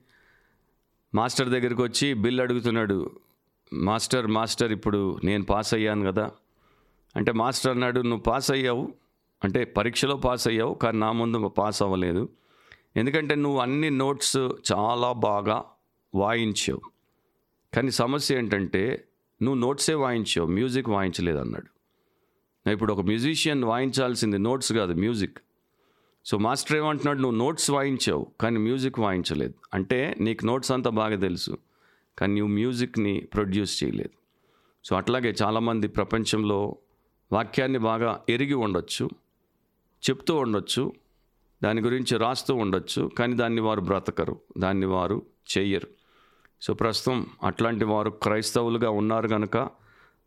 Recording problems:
squashed, flat; somewhat

